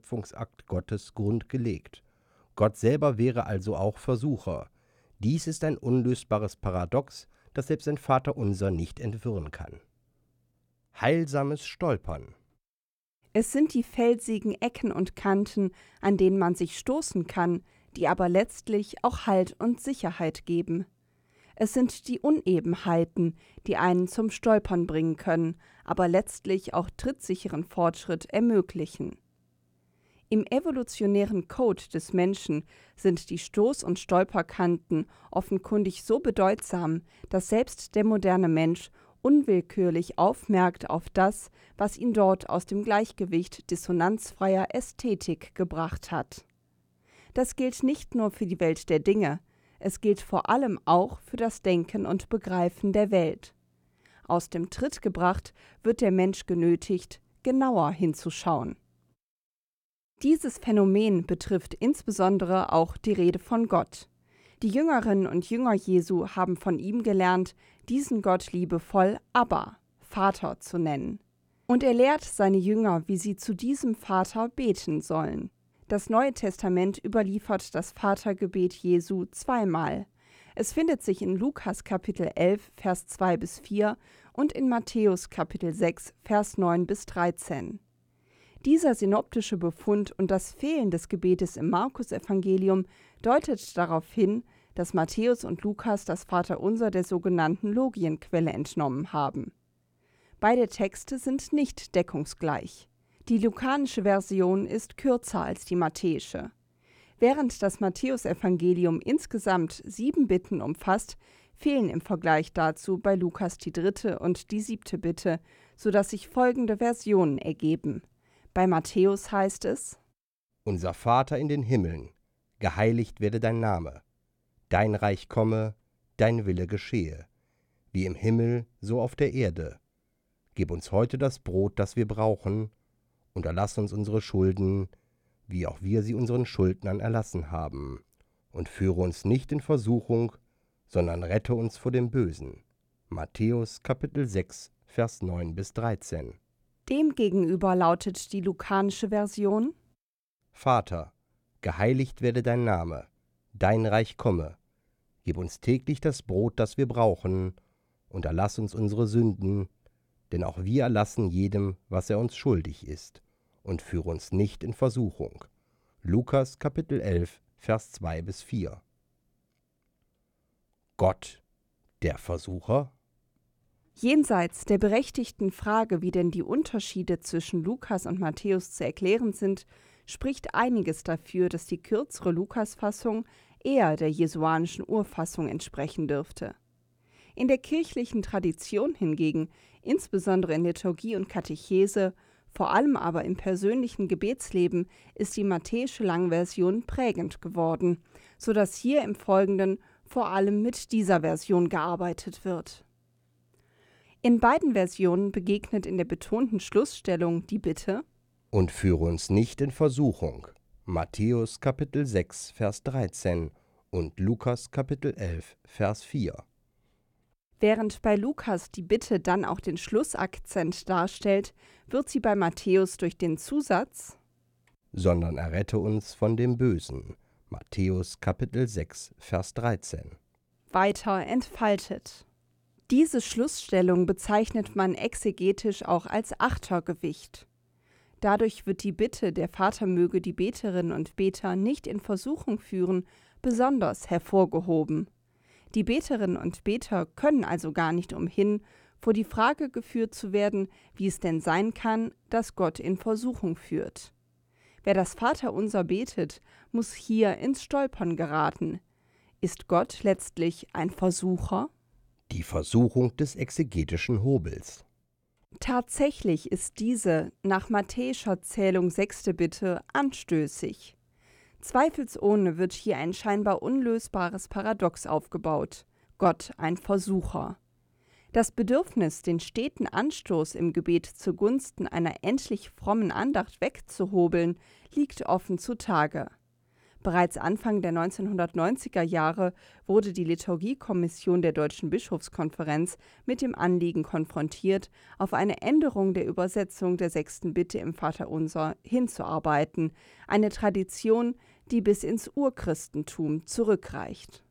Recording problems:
none

